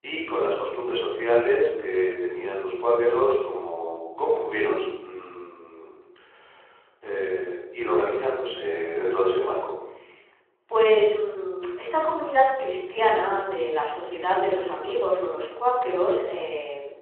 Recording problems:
room echo; noticeable; dies away in 0.8 s
phone-call audio
off-mic speech; somewhat distant

